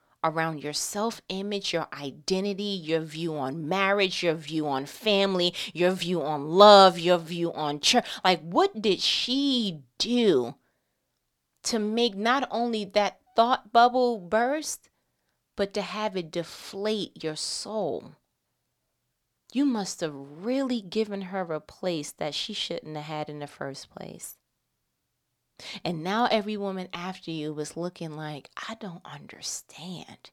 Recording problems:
none

